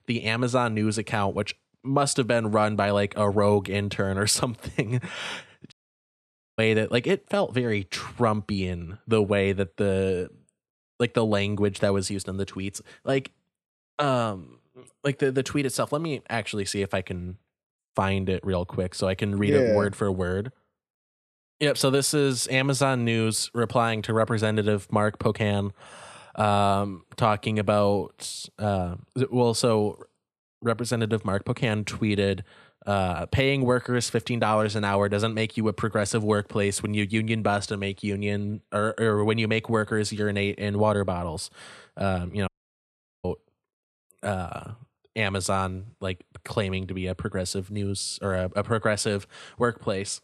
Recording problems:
audio cutting out; at 5.5 s for 1 s and at 42 s for 1 s

